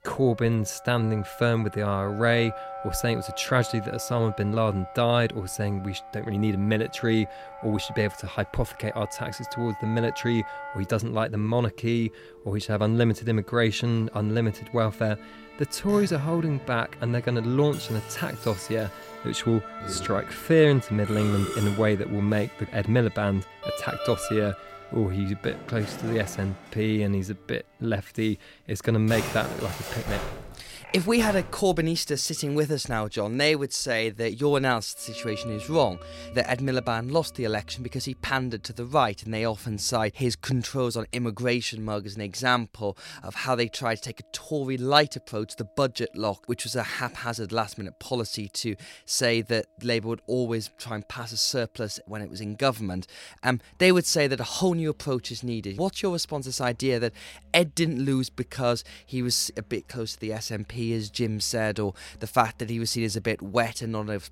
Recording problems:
background music; noticeable; throughout; 15 dB below the speech

